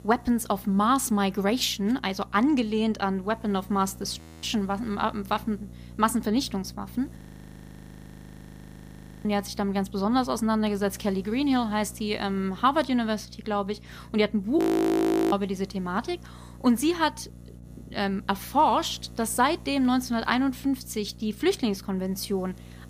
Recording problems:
electrical hum; faint; throughout; 60 Hz, 25 dB below the speech
audio freezing; at 4 s, at 7 s for 2 s and at 15 s for 0.5 s

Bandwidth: 15 kHz